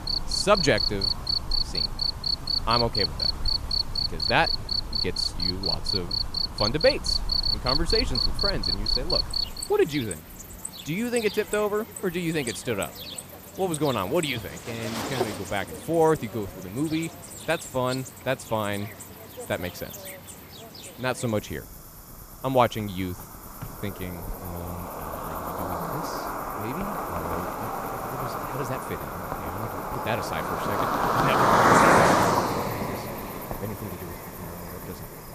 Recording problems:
animal sounds; very loud; throughout; 3 dB above the speech

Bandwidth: 14.5 kHz